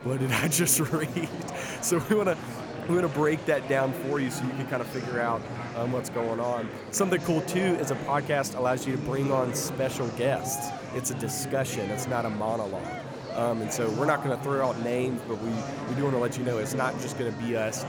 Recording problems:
murmuring crowd; loud; throughout; 7 dB below the speech

